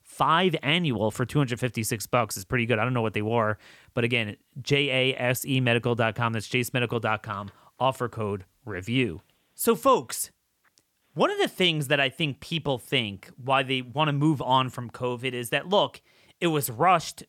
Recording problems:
none

